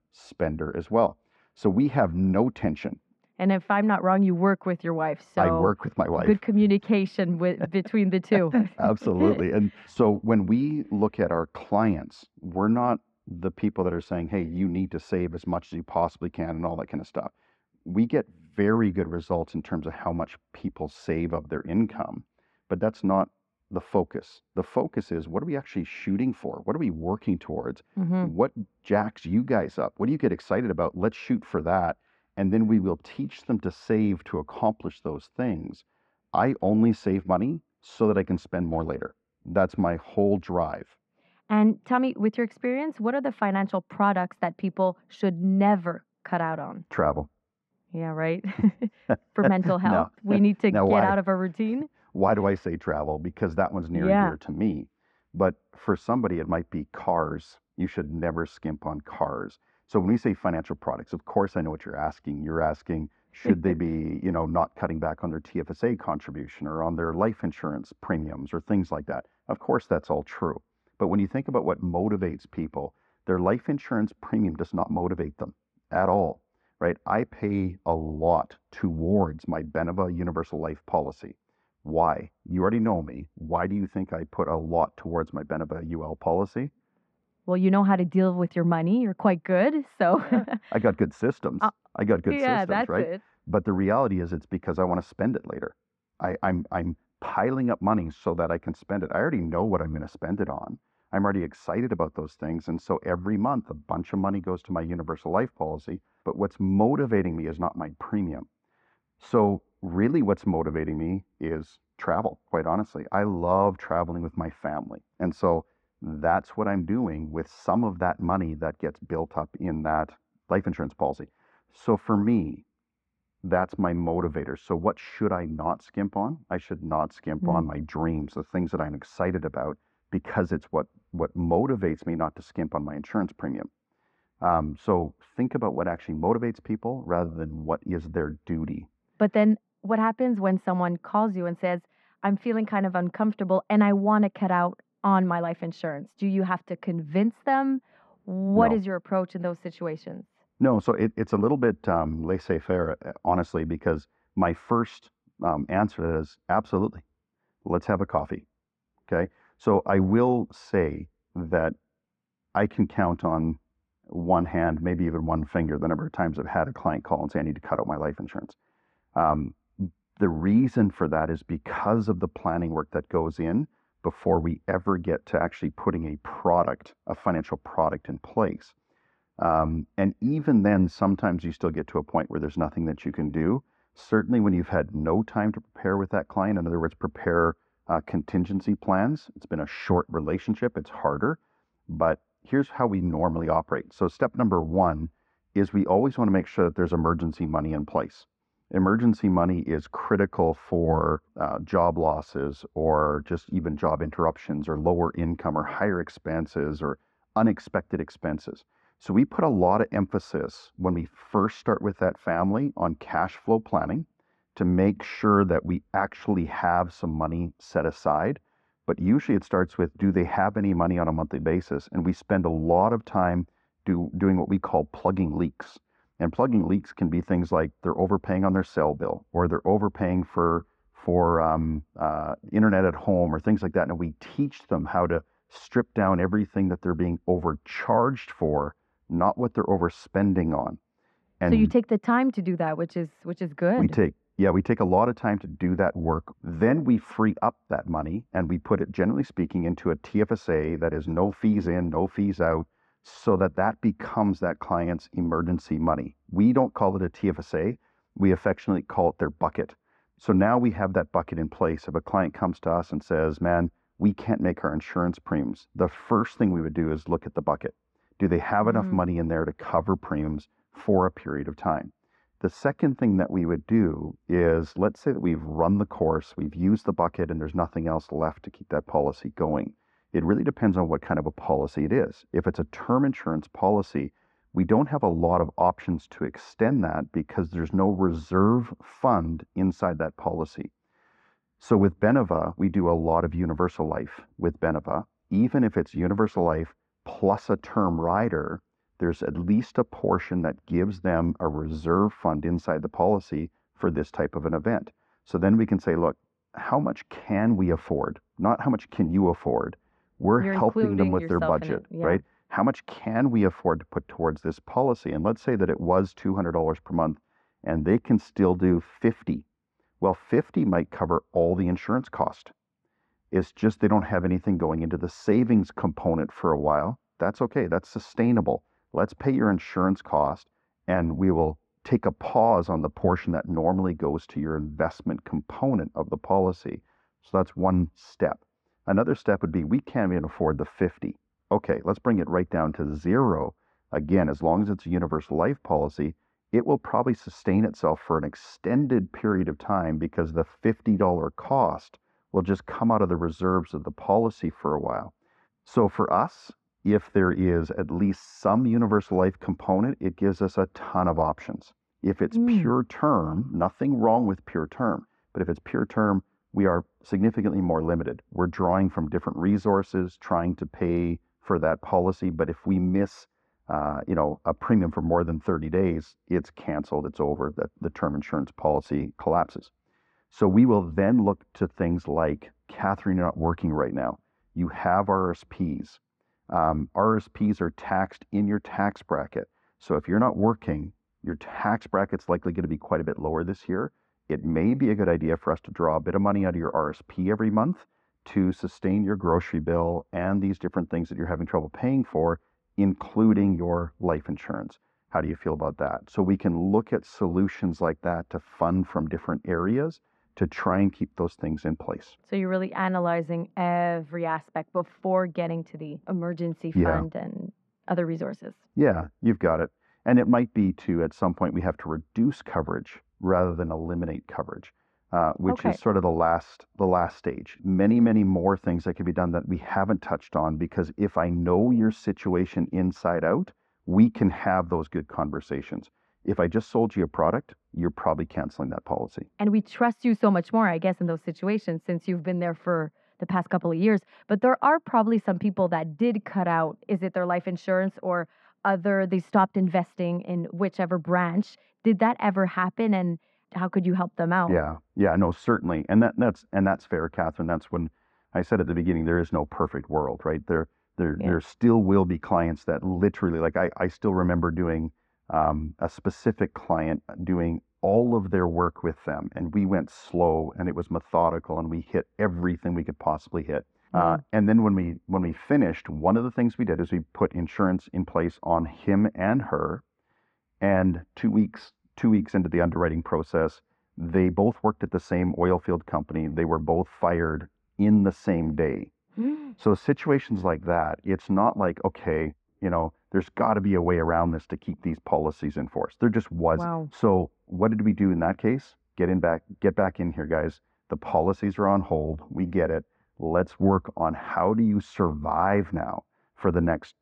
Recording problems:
muffled; very; fading above 1.5 kHz

